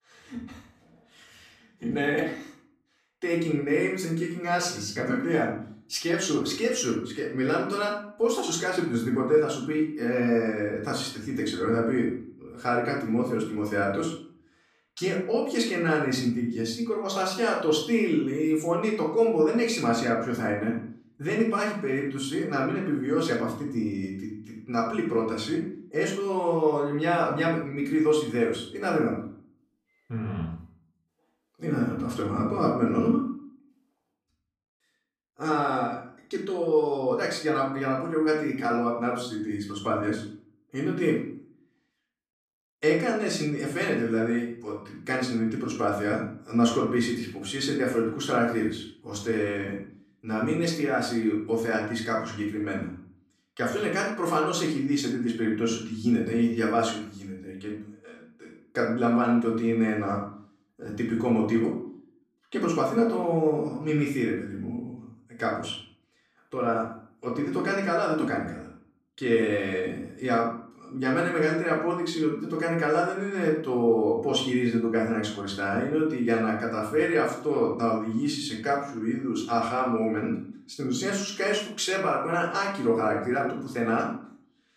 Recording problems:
off-mic speech; far
room echo; noticeable; dies away in 0.5 s

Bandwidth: 14.5 kHz